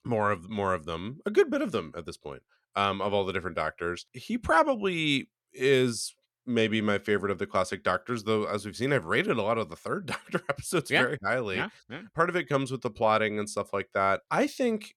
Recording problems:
none

